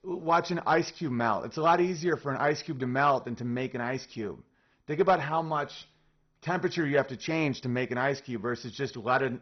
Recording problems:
garbled, watery; badly; nothing above 6 kHz

